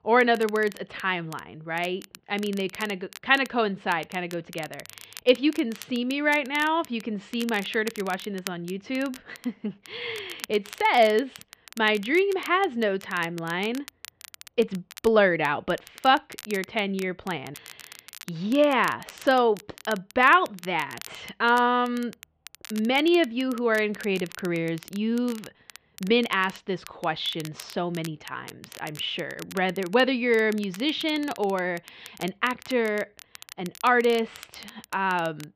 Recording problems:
muffled; slightly; fading above 3 kHz
crackle, like an old record; noticeable; 20 dB below the speech

